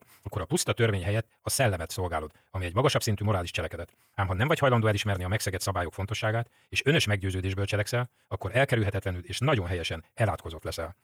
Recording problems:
wrong speed, natural pitch; too fast; 1.8 times normal speed

